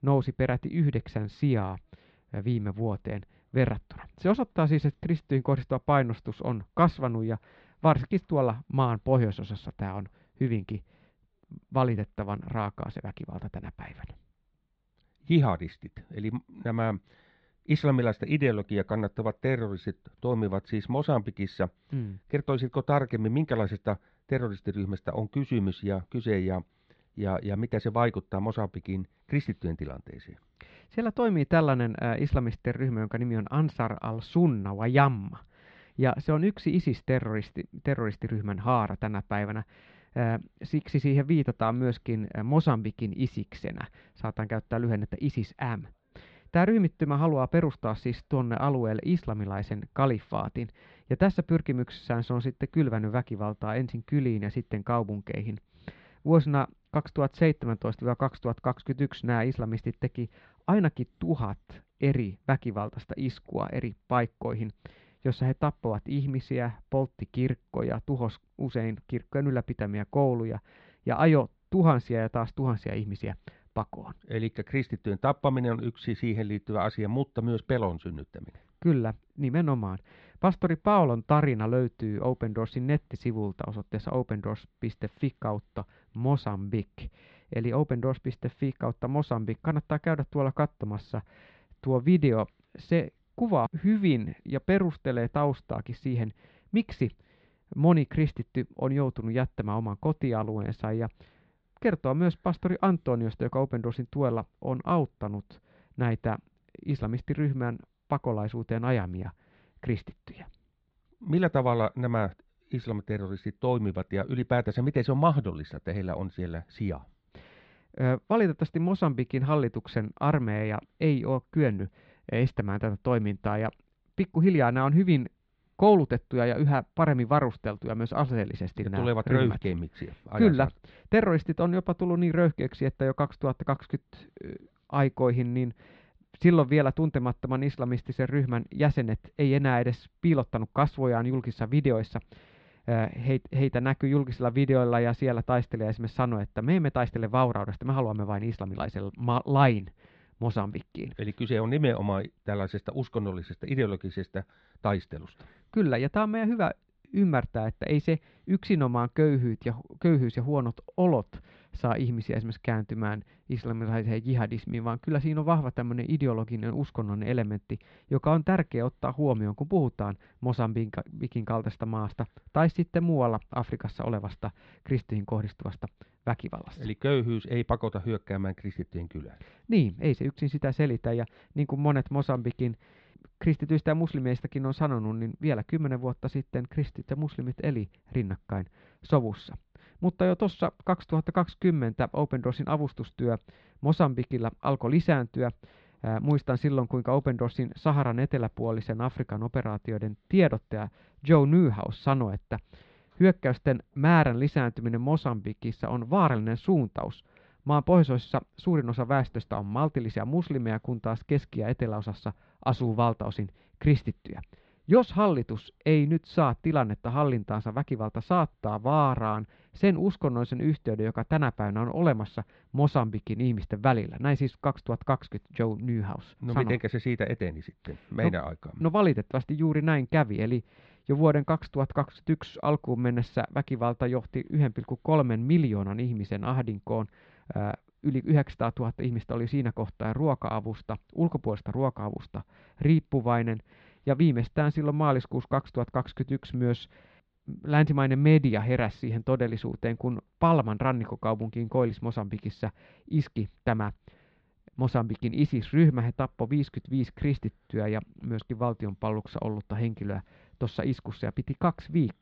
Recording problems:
muffled; slightly; fading above 4 kHz

